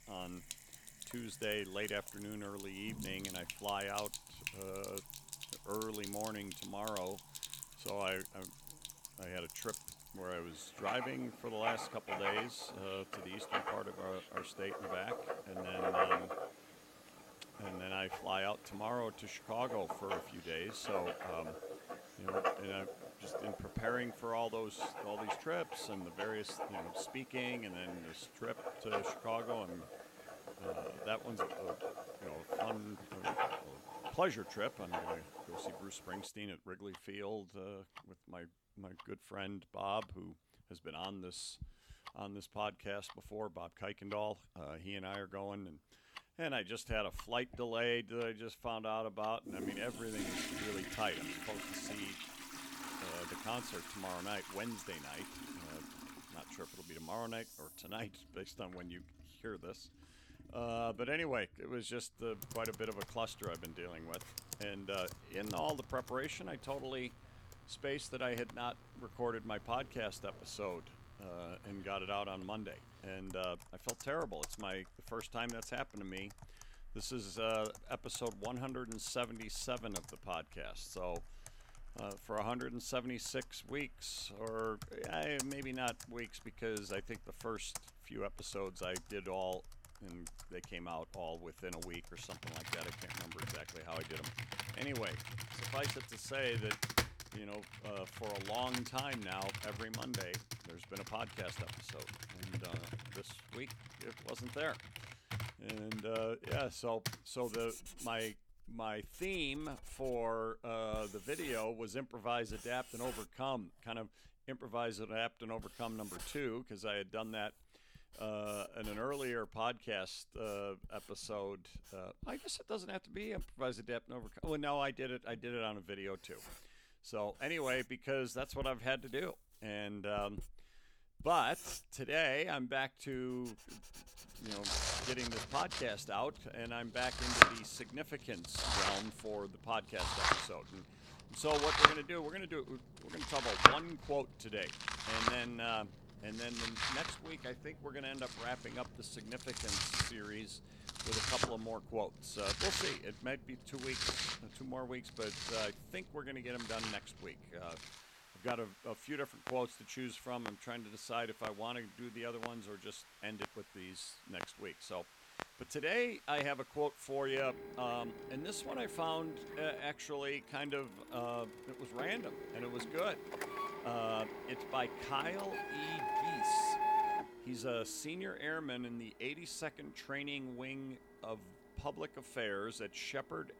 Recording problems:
household noises; very loud; throughout; 1 dB above the speech

